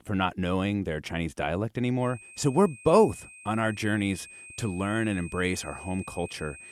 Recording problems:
high-pitched whine; noticeable; from 2 s on; 2.5 kHz, 15 dB below the speech

